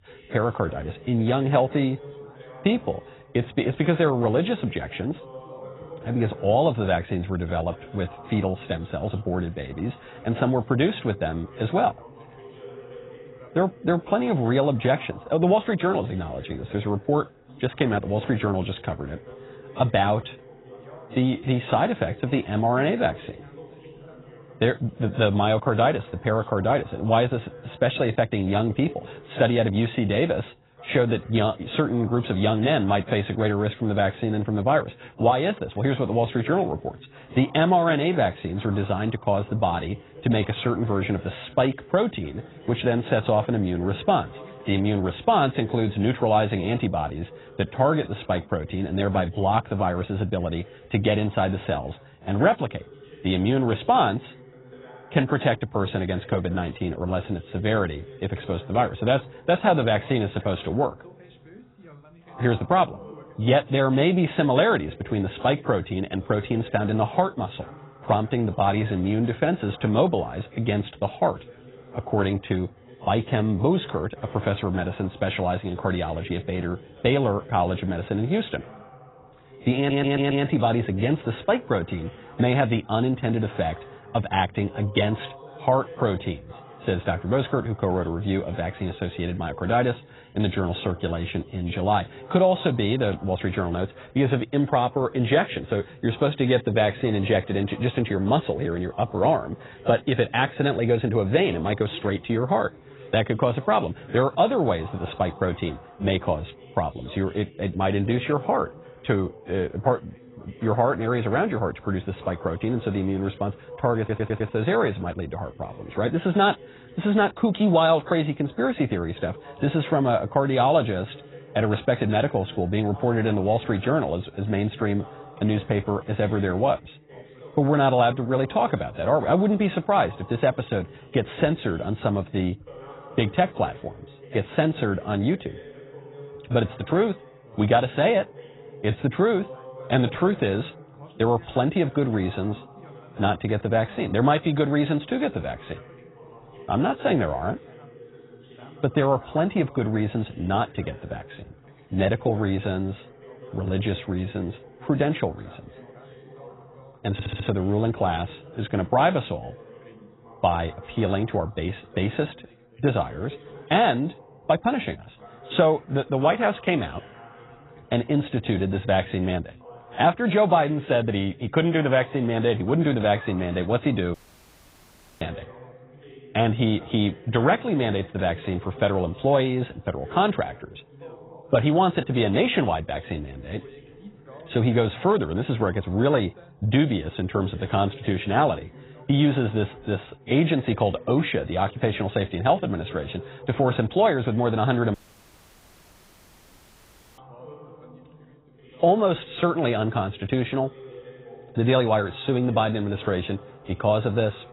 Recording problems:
garbled, watery; badly; nothing above 4 kHz
background chatter; faint; throughout; 2 voices, 20 dB below the speech
audio stuttering; at 1:20, at 1:54 and at 2:37
audio cutting out; at 2:54 for 1 s and at 3:15 for 2 s

